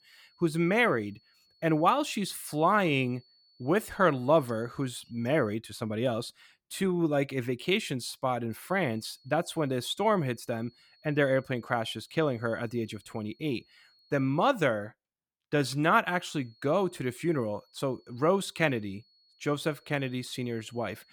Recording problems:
high-pitched whine; faint; until 5.5 s, from 8.5 to 14 s and from 16 s on; 4.5 kHz, 35 dB below the speech

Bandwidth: 18.5 kHz